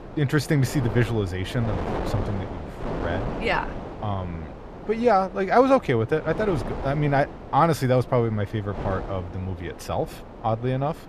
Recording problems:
wind noise on the microphone; occasional gusts; 10 dB below the speech

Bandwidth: 14.5 kHz